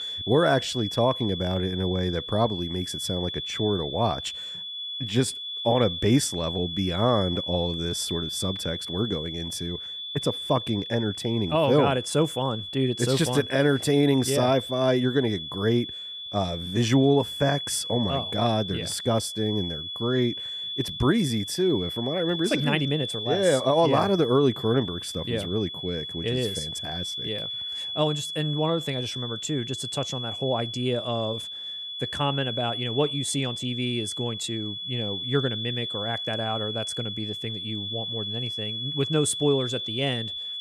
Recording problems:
high-pitched whine; loud; throughout; 3.5 kHz, 5 dB below the speech

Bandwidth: 14.5 kHz